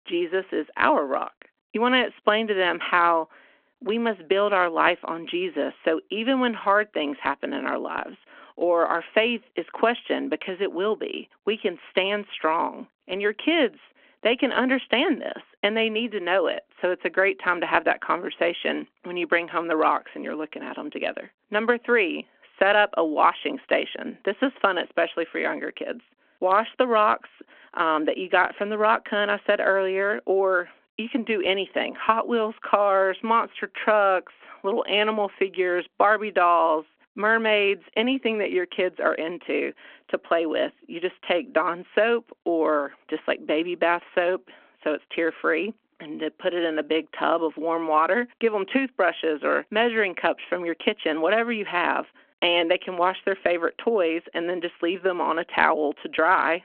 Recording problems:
phone-call audio

